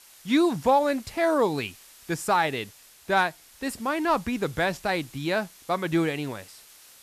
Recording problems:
hiss; faint; throughout; 20 dB below the speech

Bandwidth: 14 kHz